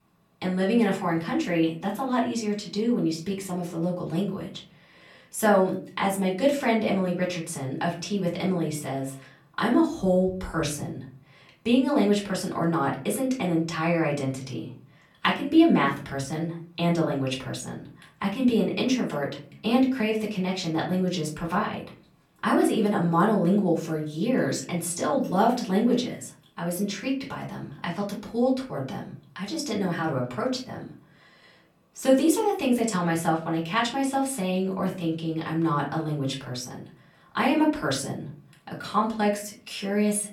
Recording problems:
off-mic speech; far
room echo; slight; dies away in 0.4 s

